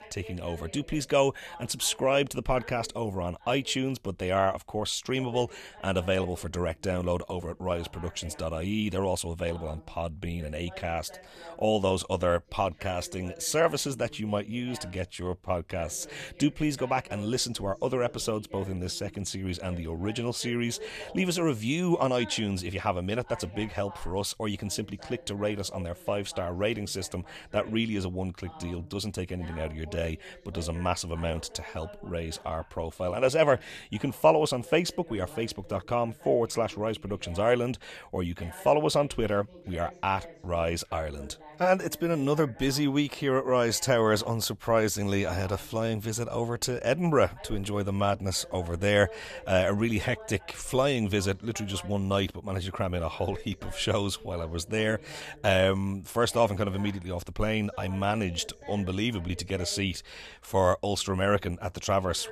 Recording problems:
voice in the background; noticeable; throughout; 20 dB below the speech

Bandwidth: 14.5 kHz